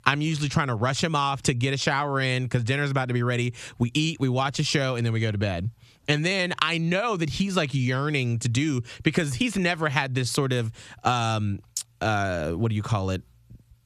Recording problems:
squashed, flat; somewhat

